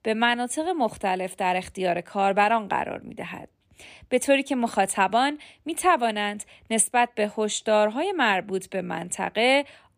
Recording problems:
none

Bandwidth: 15 kHz